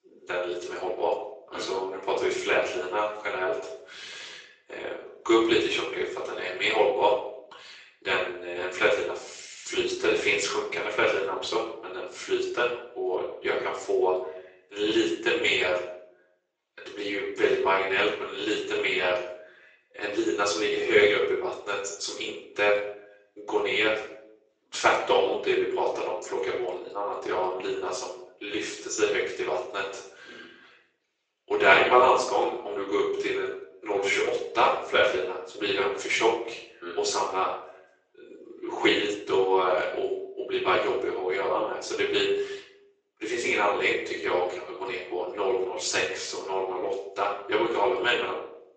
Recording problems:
off-mic speech; far
thin; very; fading below 350 Hz
room echo; noticeable; dies away in 0.6 s
garbled, watery; slightly; nothing above 7.5 kHz

